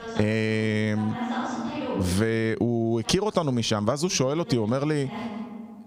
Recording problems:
squashed, flat; somewhat, background pumping
voice in the background; loud; throughout; 9 dB below the speech

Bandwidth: 15.5 kHz